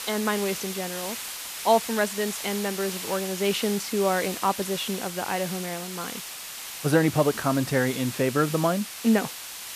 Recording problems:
hiss; loud; throughout; 7 dB below the speech

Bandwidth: 14.5 kHz